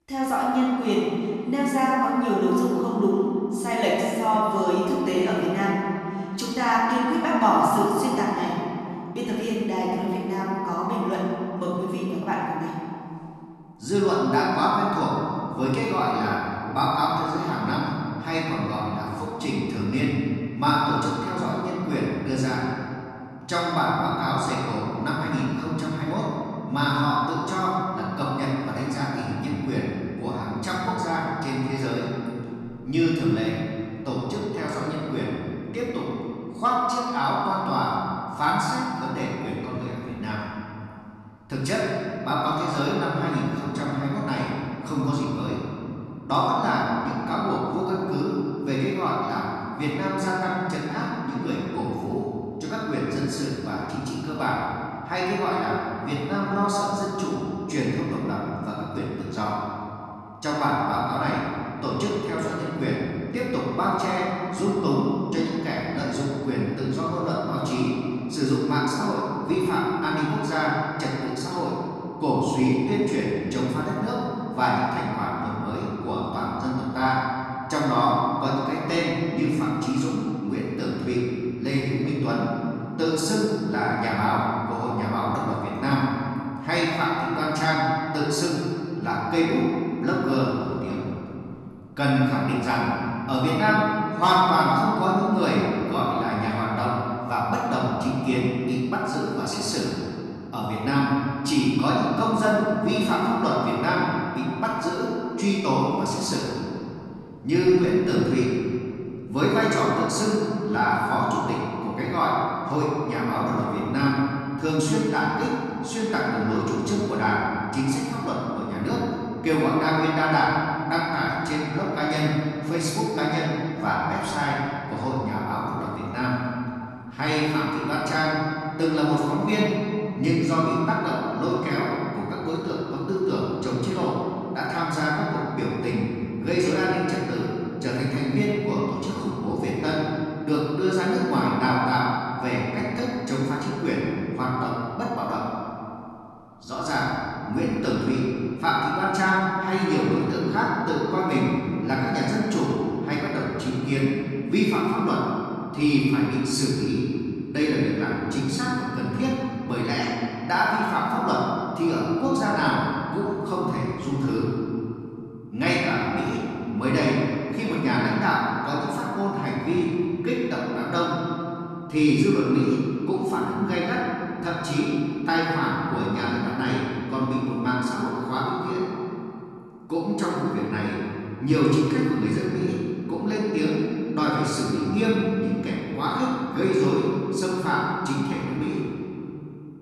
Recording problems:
room echo; strong; dies away in 2.6 s
off-mic speech; far

